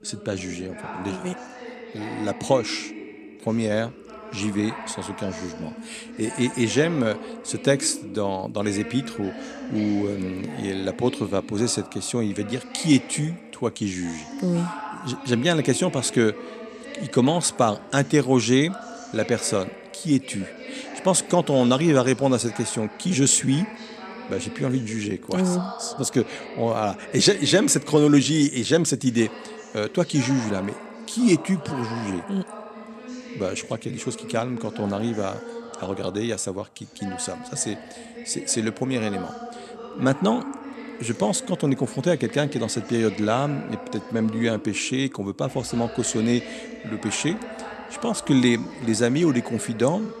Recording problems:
voice in the background; noticeable; throughout; 15 dB below the speech

